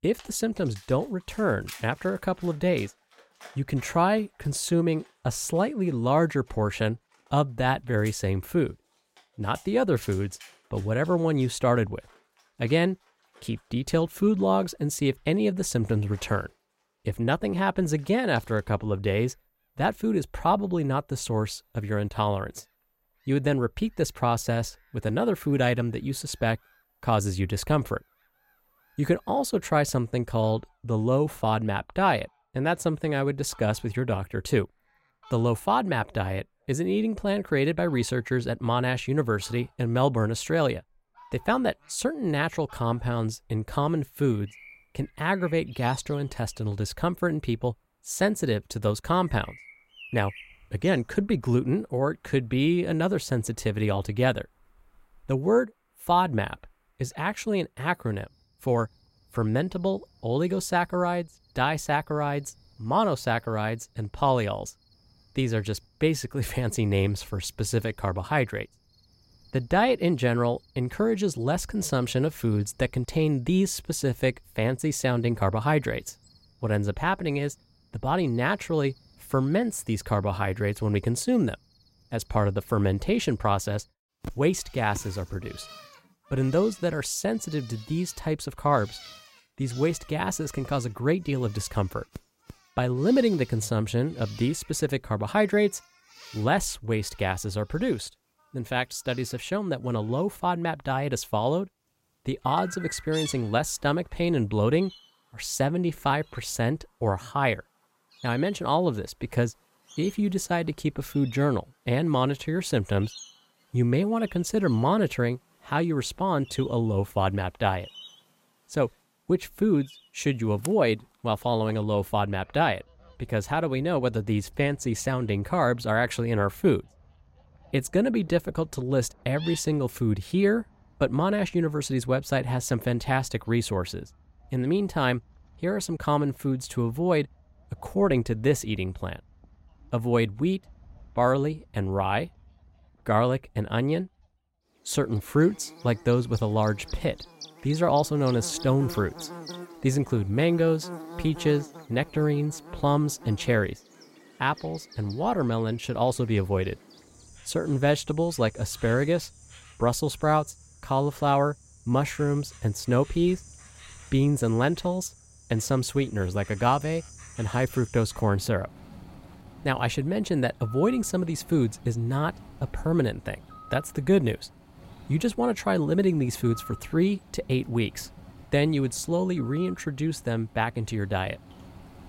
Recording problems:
animal sounds; faint; throughout; 20 dB below the speech

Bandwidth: 16 kHz